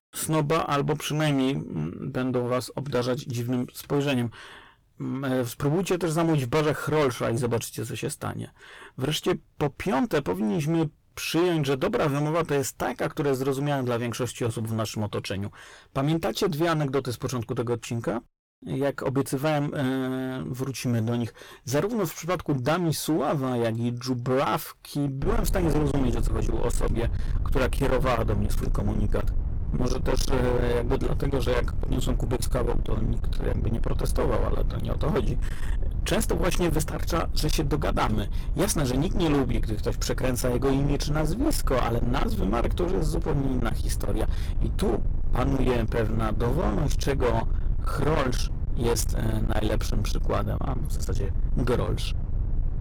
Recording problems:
distortion; heavy; 22% of the sound clipped
low rumble; noticeable; from 25 s on; 10 dB below the speech

